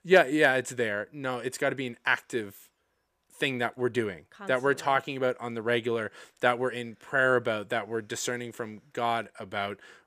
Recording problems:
none

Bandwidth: 14.5 kHz